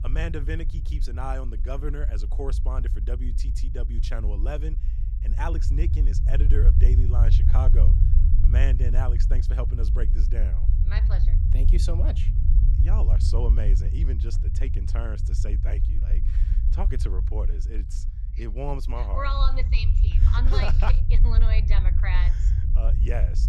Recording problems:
low rumble; loud; throughout; 6 dB below the speech

